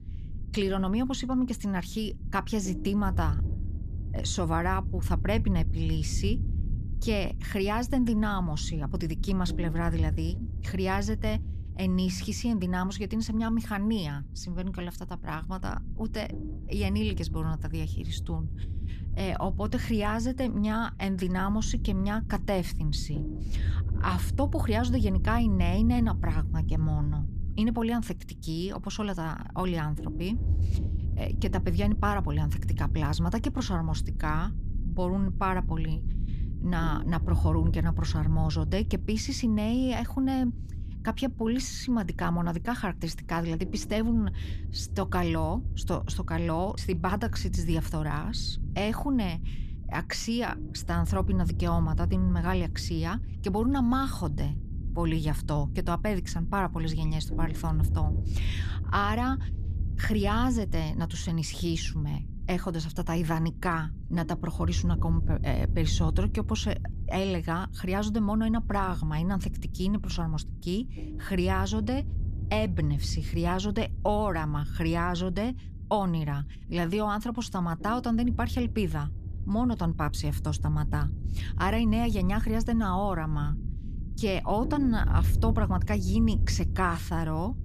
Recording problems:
low rumble; noticeable; throughout; 15 dB below the speech

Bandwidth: 14.5 kHz